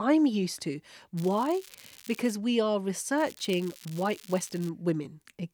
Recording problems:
crackling; noticeable; from 1 to 2.5 s and from 3 to 4.5 s; 20 dB below the speech
abrupt cut into speech; at the start

